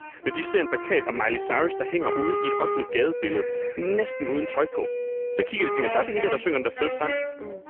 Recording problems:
phone-call audio; poor line; nothing above 3 kHz
muffled; very slightly; fading above 2.5 kHz
background music; loud; throughout; 4 dB below the speech
animal sounds; noticeable; throughout; 20 dB below the speech

